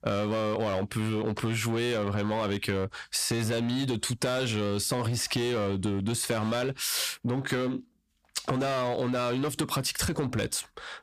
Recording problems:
distortion; slight; 14% of the sound clipped
squashed, flat; somewhat

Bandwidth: 15 kHz